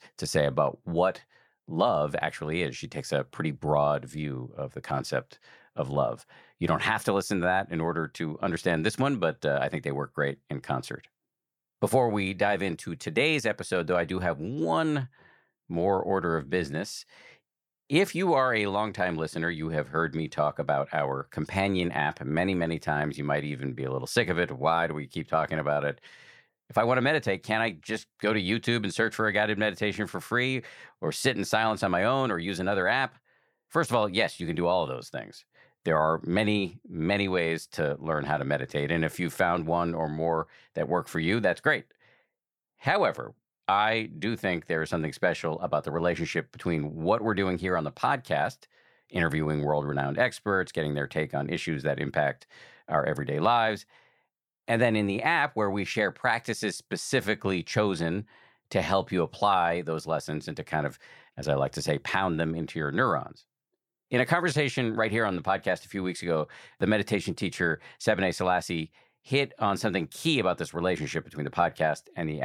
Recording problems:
abrupt cut into speech; at the end

